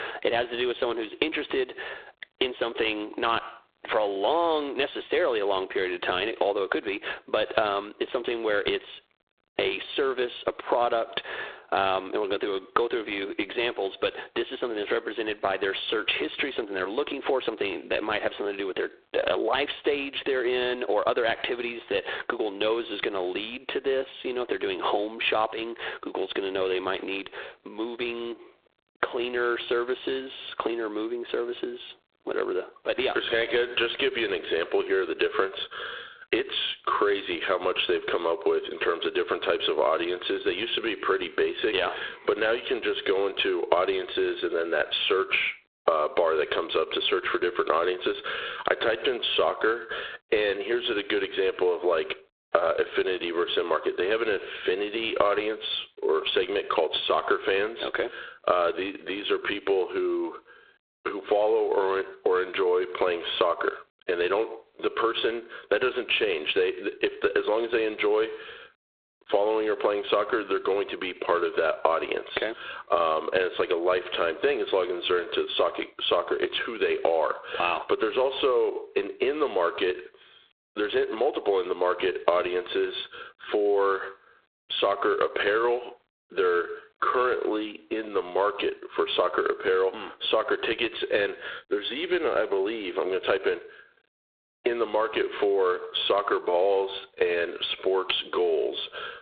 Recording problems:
phone-call audio; poor line; nothing above 3.5 kHz
squashed, flat; heavily

